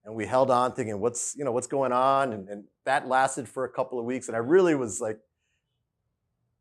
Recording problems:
none

